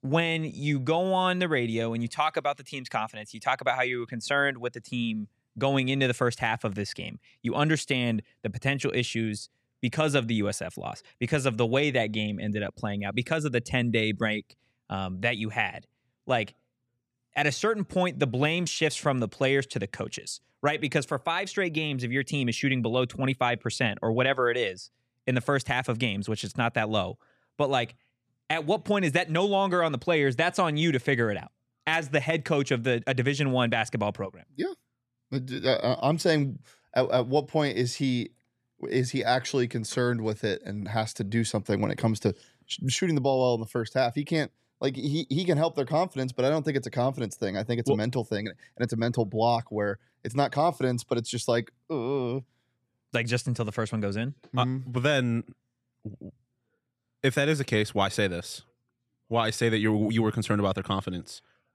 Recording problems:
none

